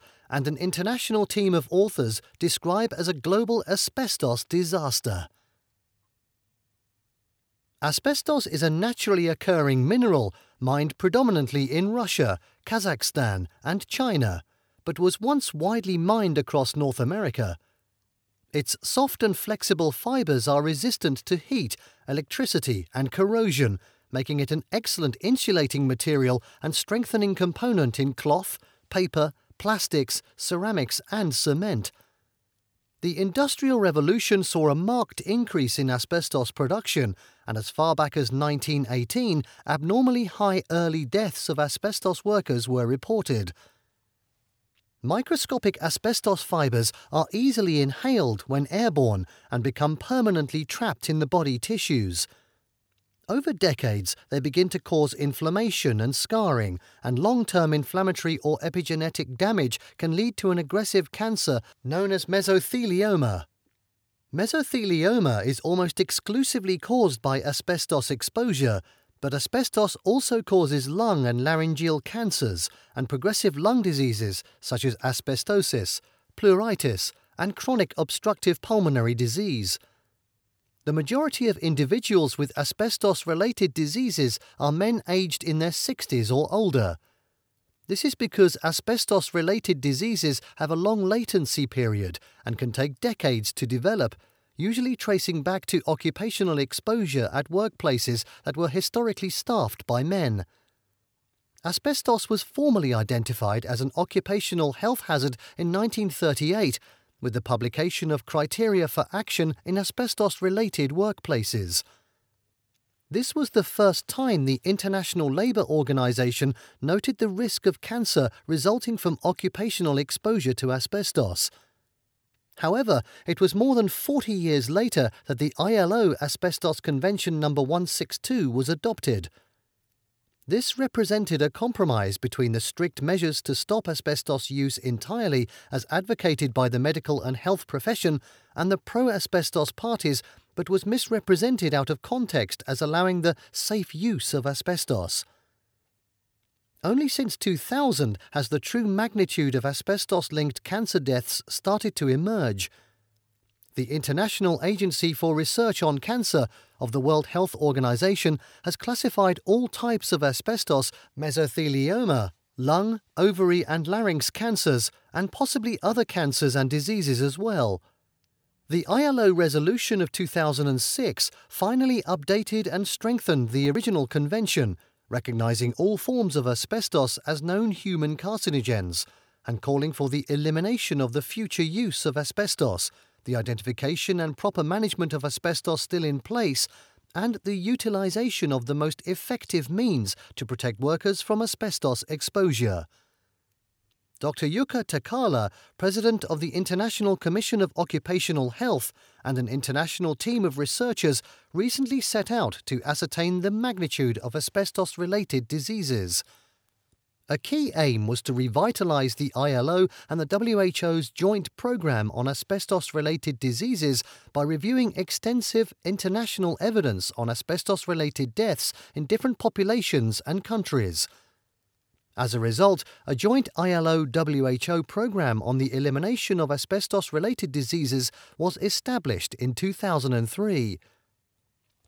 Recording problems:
none

